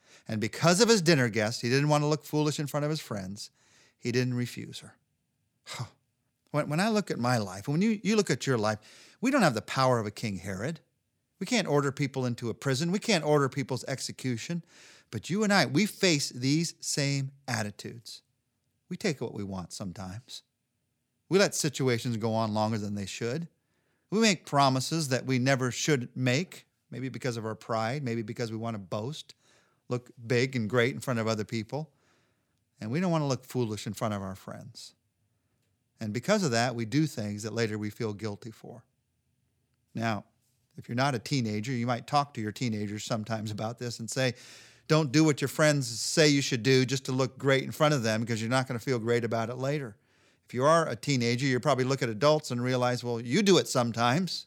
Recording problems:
none

